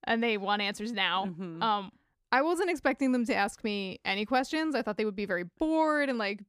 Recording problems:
none

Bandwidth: 15 kHz